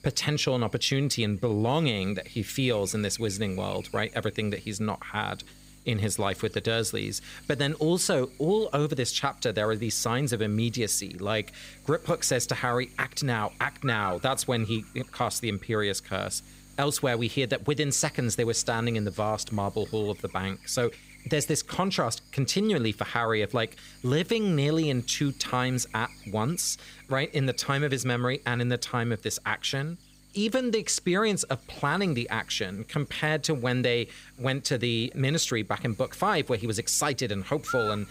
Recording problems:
electrical hum; noticeable; throughout; 50 Hz, 15 dB below the speech

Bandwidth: 15.5 kHz